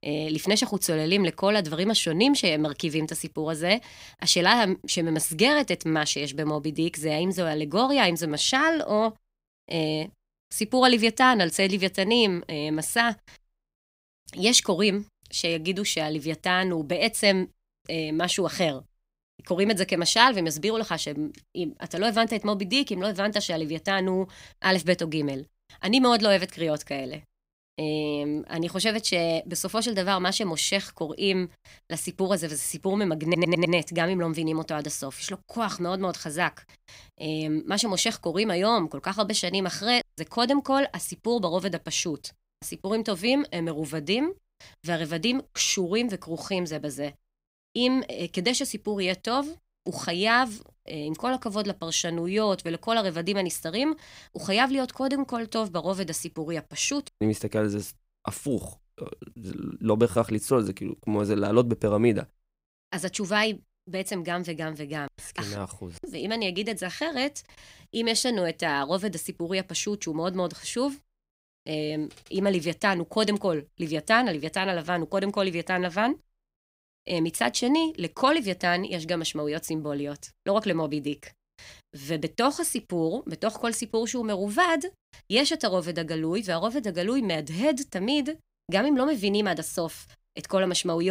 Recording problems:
audio stuttering; at 33 s
abrupt cut into speech; at the end

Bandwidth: 15.5 kHz